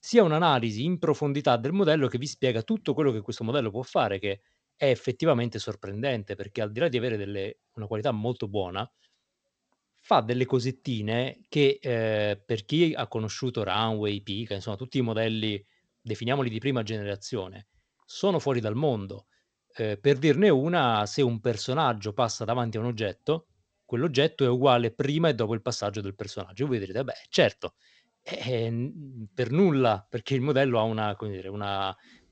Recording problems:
garbled, watery; slightly

